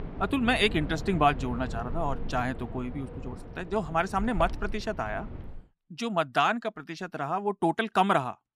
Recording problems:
wind in the background; noticeable; until 5.5 s; 10 dB below the speech

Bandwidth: 14.5 kHz